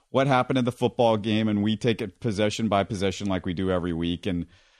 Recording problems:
none

